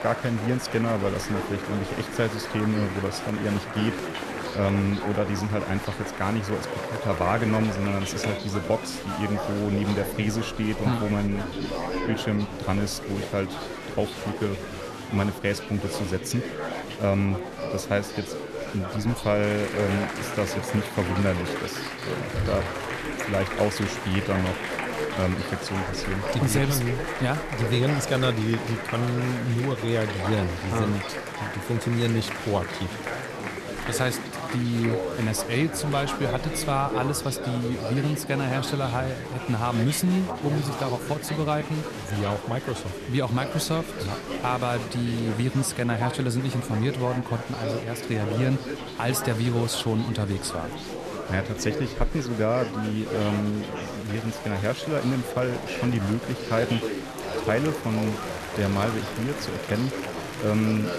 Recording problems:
murmuring crowd; loud; throughout; 5 dB below the speech

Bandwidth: 13.5 kHz